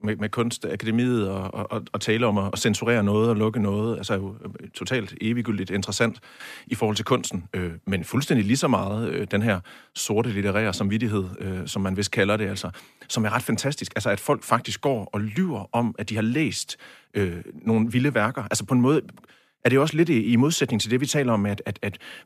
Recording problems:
none

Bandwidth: 14.5 kHz